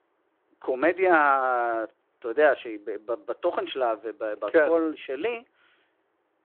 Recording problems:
phone-call audio

